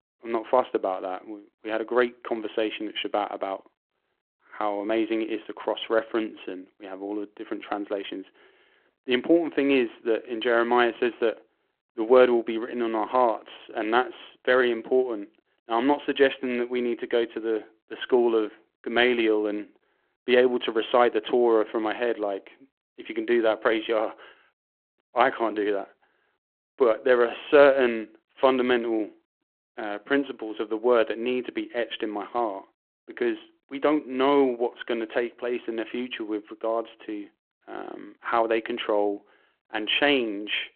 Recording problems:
phone-call audio

